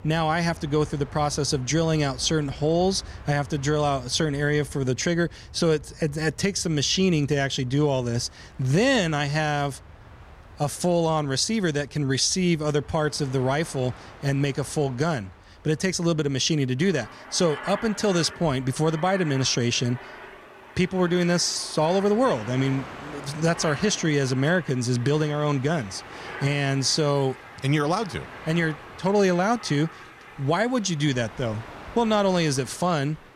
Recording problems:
train or aircraft noise; noticeable; throughout; 20 dB below the speech

